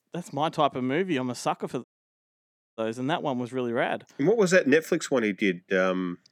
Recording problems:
audio cutting out; at 2 s for 1 s

